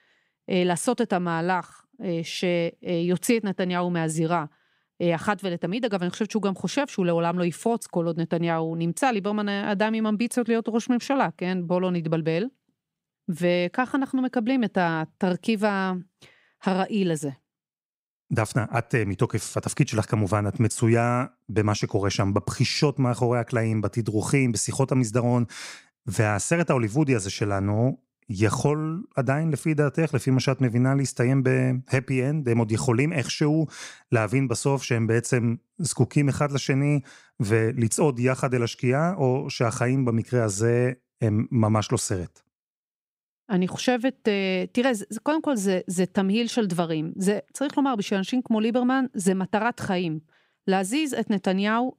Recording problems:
none

